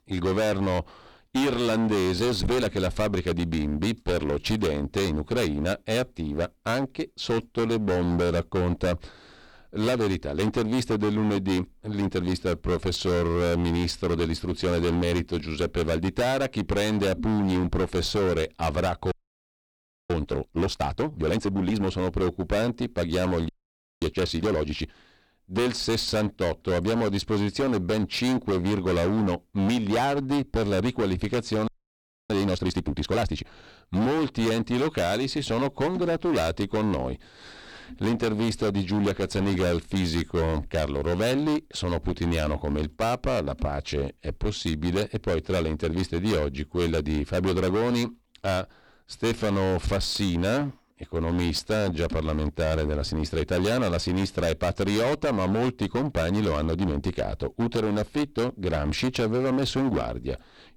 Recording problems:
distortion; heavy; 24% of the sound clipped
audio freezing; at 19 s for 1 s, at 23 s for 0.5 s and at 32 s for 0.5 s

